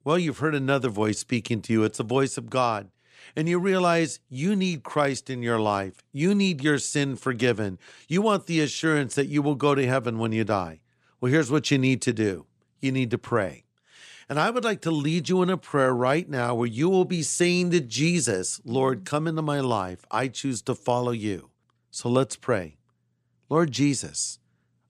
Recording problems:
none

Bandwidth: 14.5 kHz